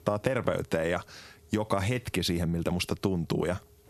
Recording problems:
squashed, flat; heavily

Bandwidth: 13.5 kHz